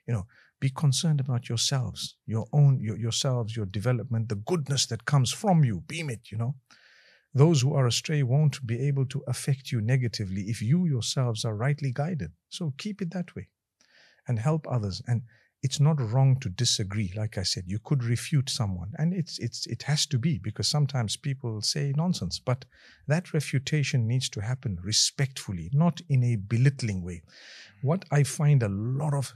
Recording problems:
none

